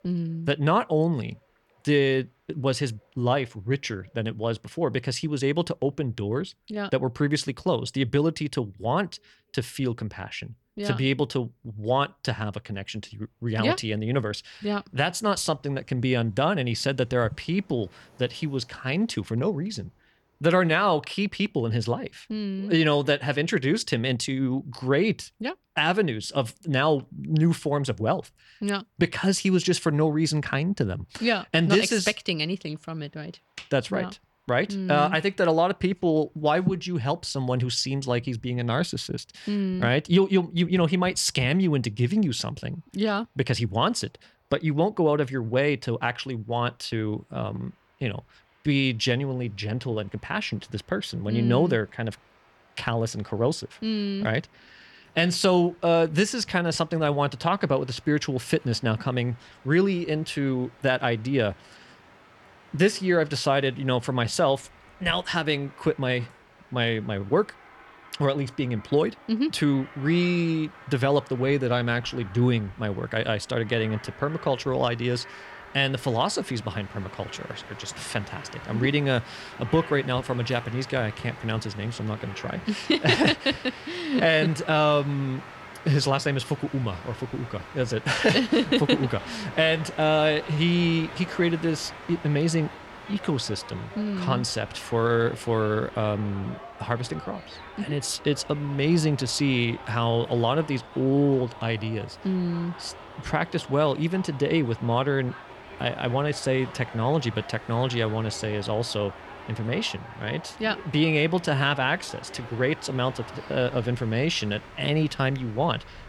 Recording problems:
train or aircraft noise; noticeable; throughout; 15 dB below the speech

